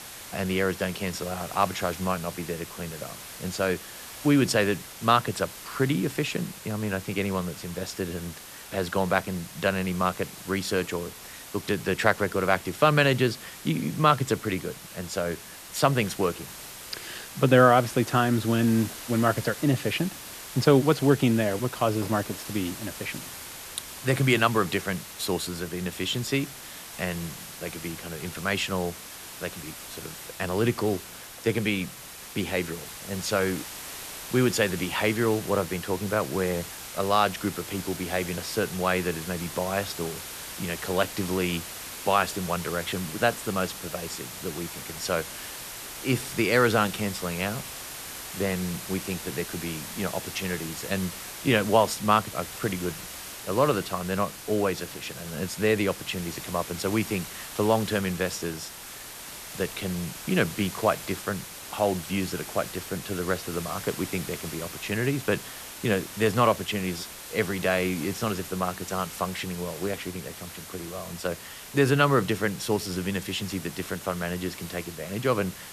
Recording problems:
hiss; noticeable; throughout; 10 dB below the speech

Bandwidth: 14 kHz